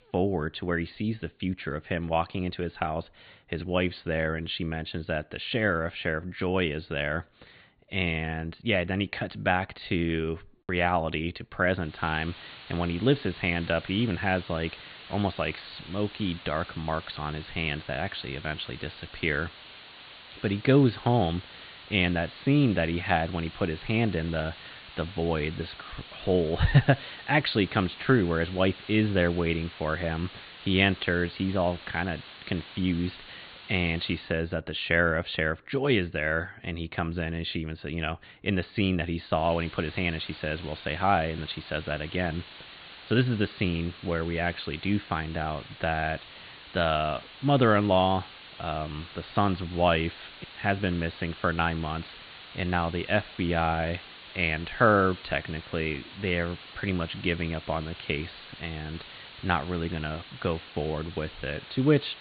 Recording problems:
high frequencies cut off; severe; nothing above 4.5 kHz
hiss; noticeable; from 12 to 34 s and from 39 s on; 15 dB below the speech

